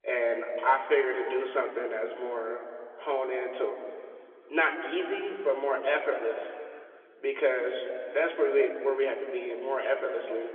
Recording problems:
room echo; noticeable; dies away in 2.4 s
phone-call audio; nothing above 3.5 kHz
off-mic speech; somewhat distant

